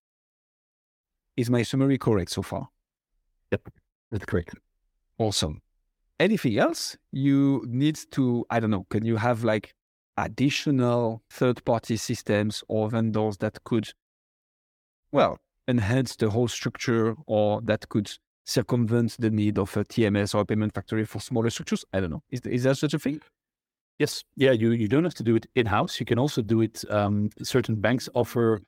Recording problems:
none

